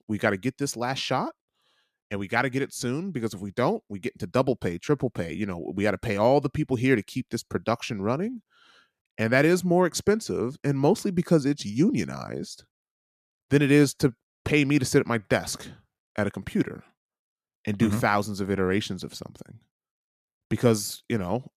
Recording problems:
none

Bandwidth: 14.5 kHz